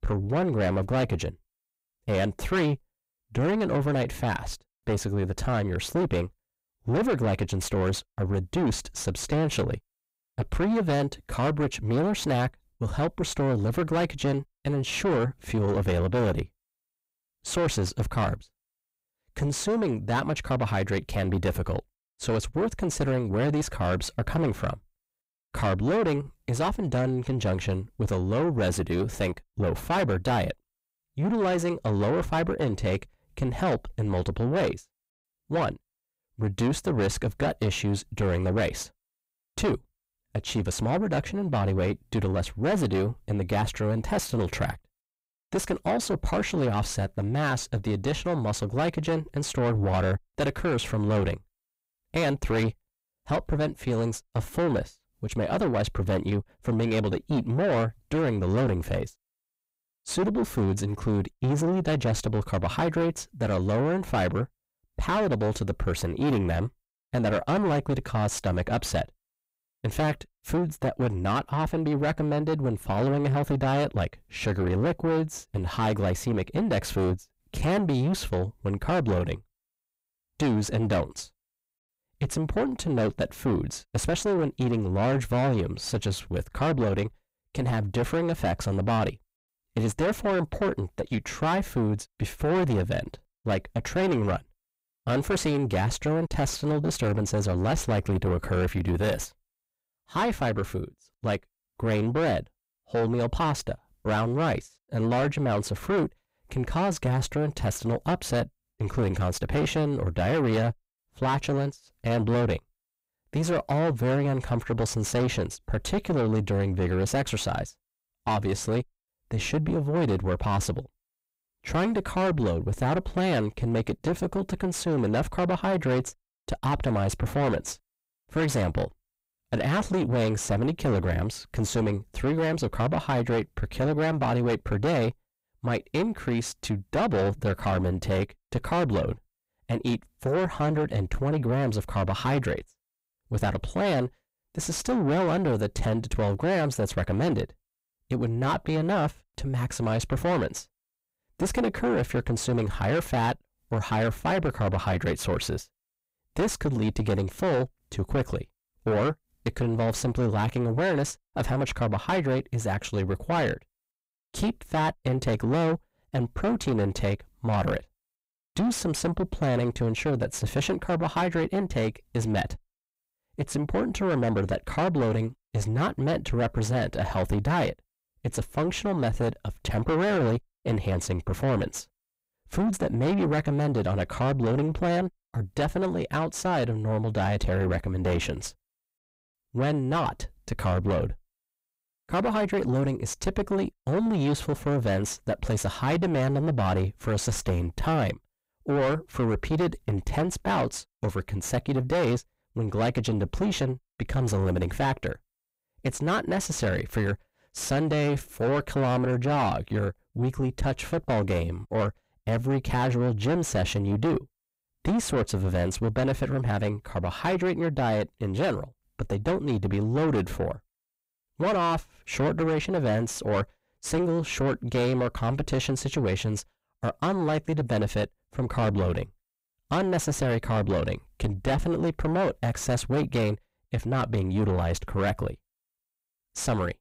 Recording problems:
distortion; heavy; 6 dB below the speech

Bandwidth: 15.5 kHz